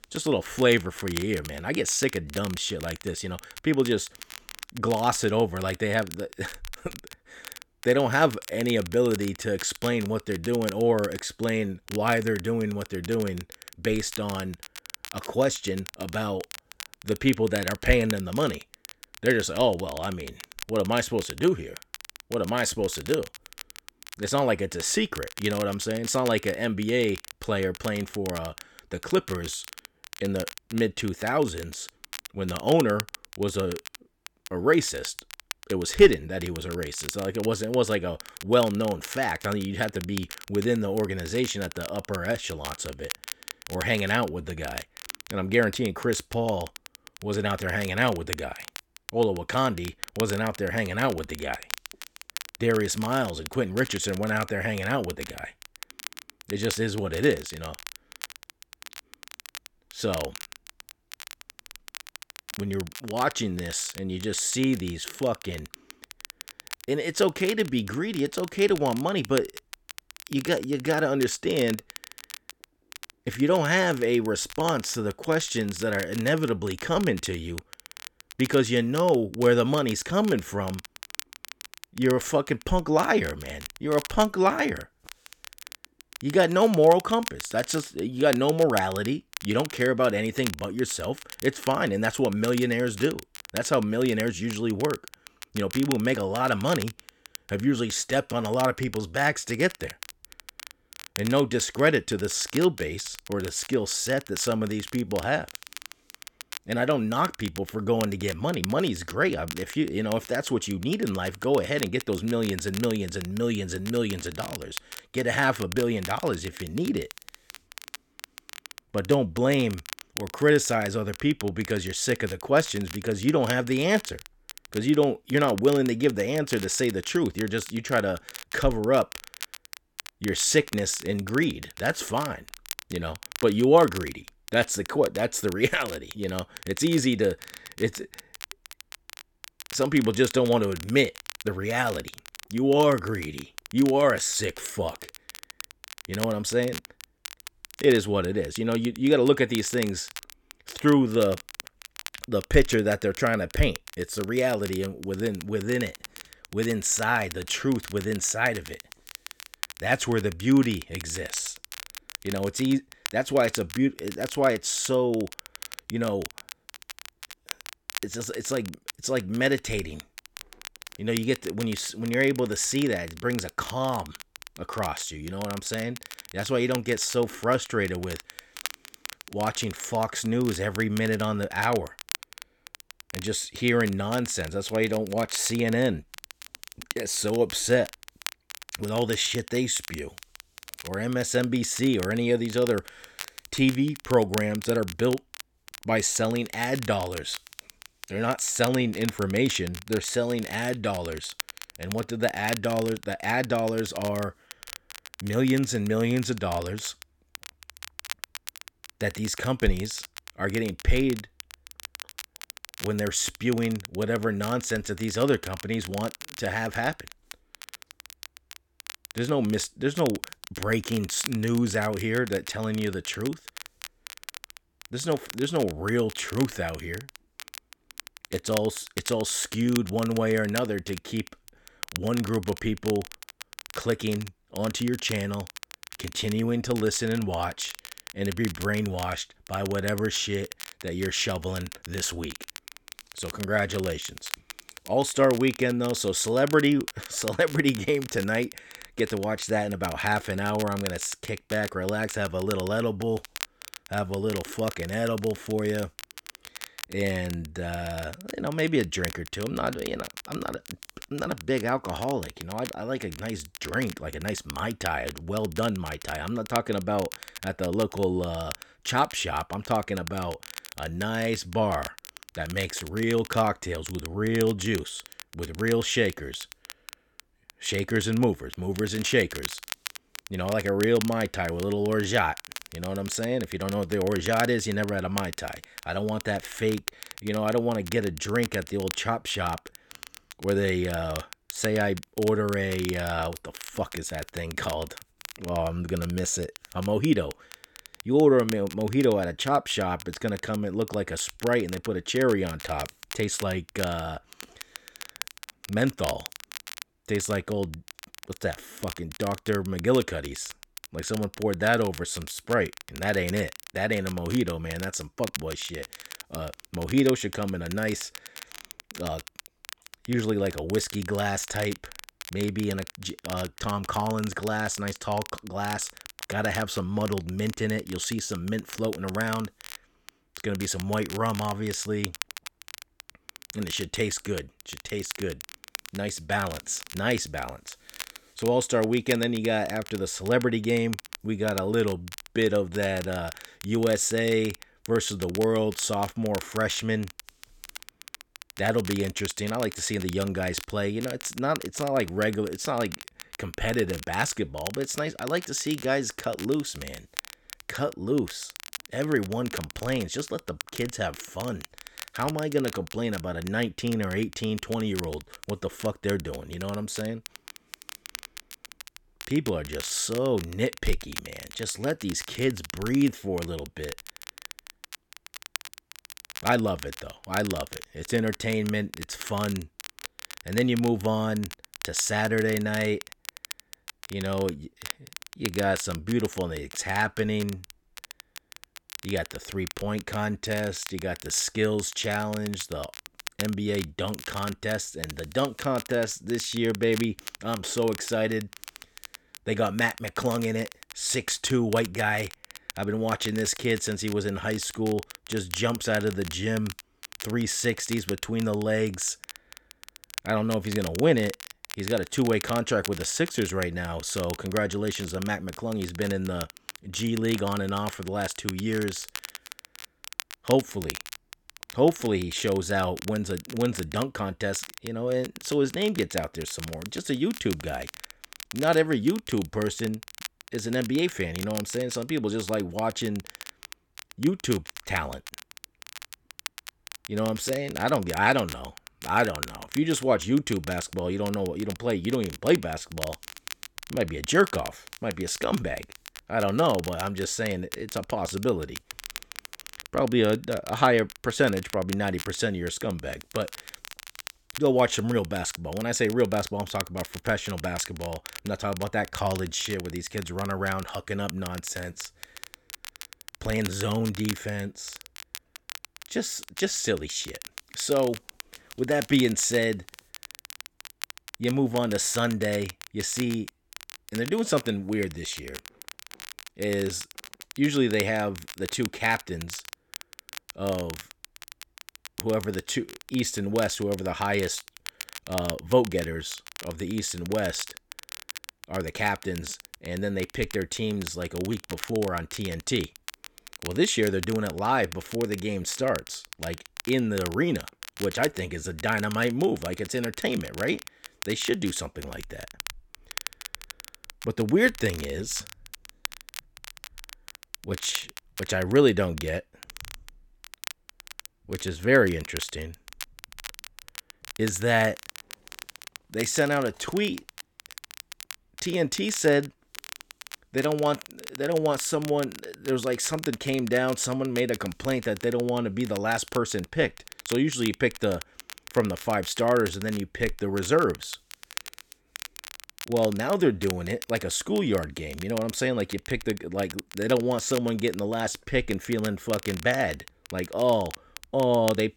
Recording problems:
crackle, like an old record; noticeable; 15 dB below the speech

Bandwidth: 18 kHz